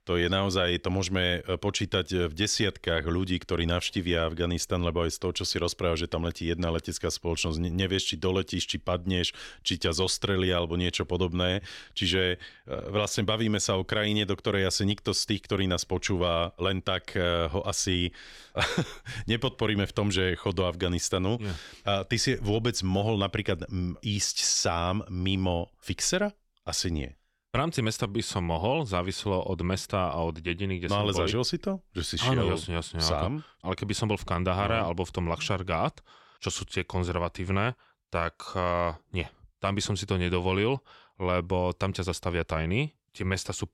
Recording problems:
none

